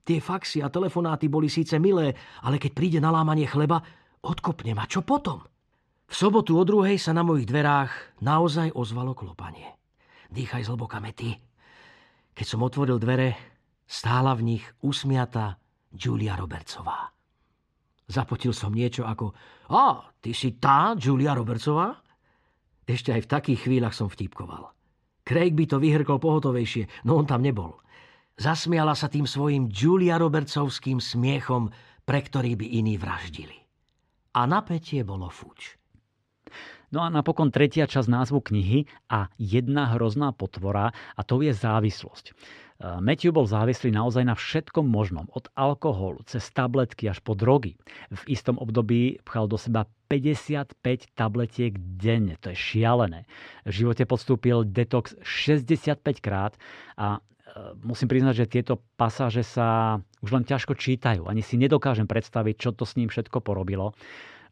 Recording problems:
muffled; very slightly; fading above 3.5 kHz

